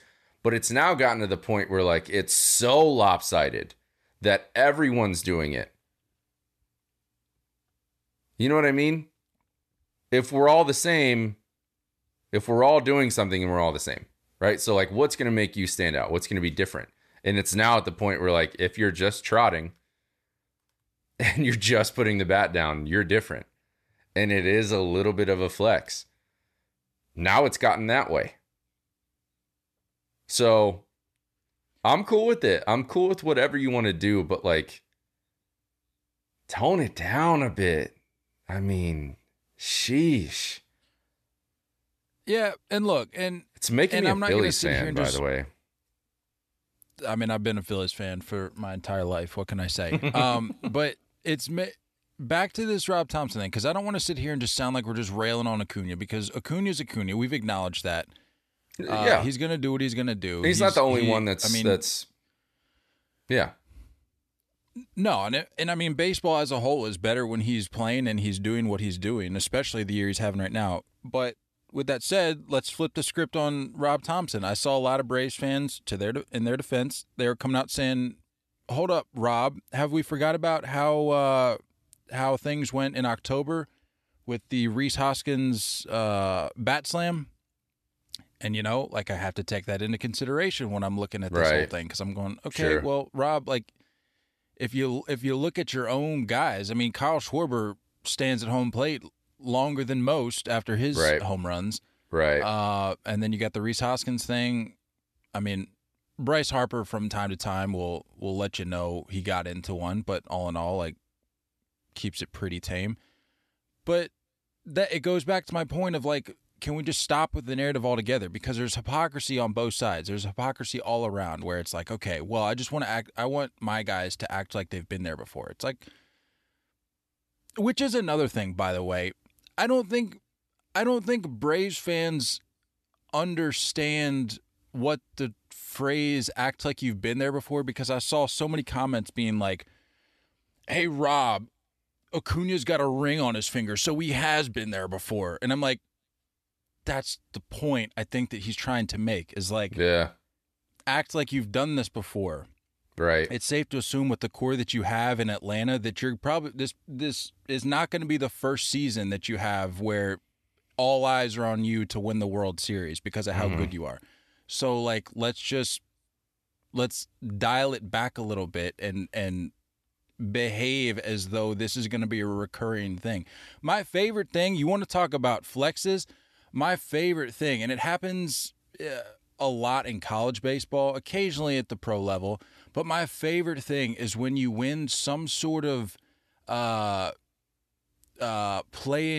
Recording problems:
abrupt cut into speech; at the end

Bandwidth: 13.5 kHz